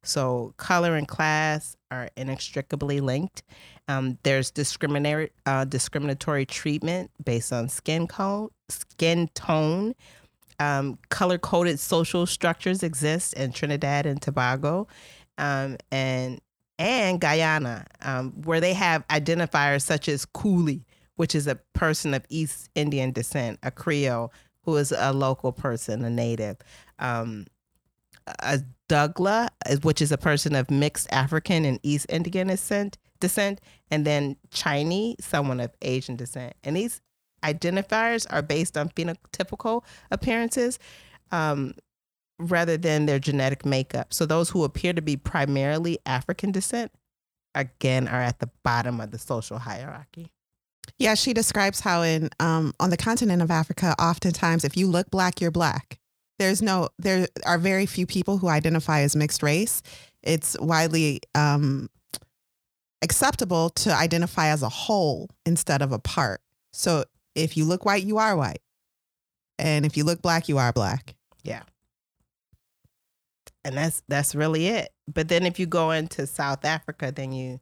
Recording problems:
none

